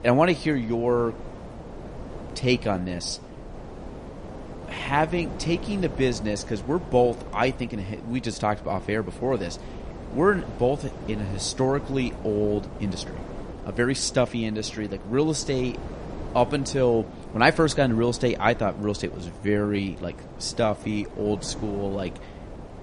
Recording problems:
garbled, watery; slightly; nothing above 10 kHz
wind noise on the microphone; occasional gusts; 15 dB below the speech
uneven, jittery; strongly; from 2 to 22 s

